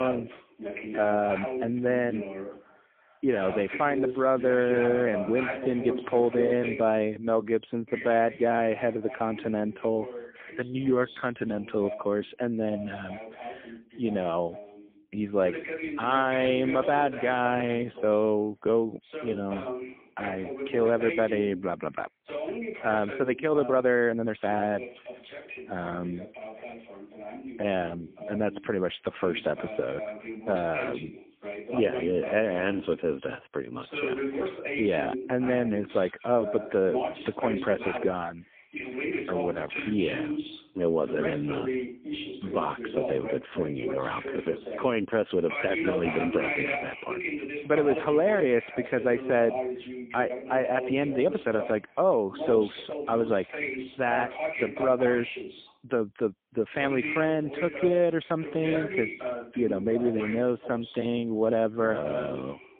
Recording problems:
phone-call audio; poor line; nothing above 3.5 kHz
voice in the background; loud; throughout; 7 dB below the speech
abrupt cut into speech; at the start
uneven, jittery; strongly; from 1 s to 1:01

